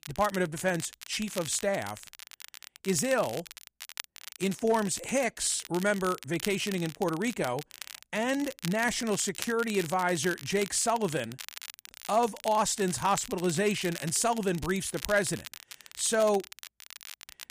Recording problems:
crackle, like an old record; noticeable; 15 dB below the speech

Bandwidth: 15 kHz